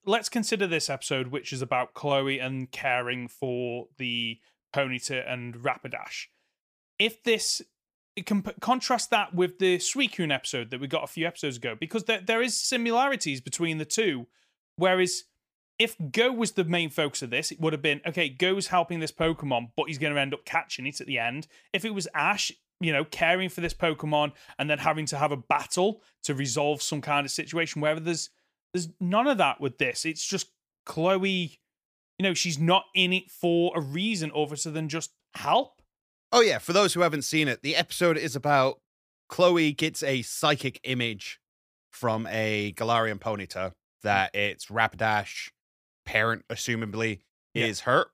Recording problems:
none

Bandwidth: 15 kHz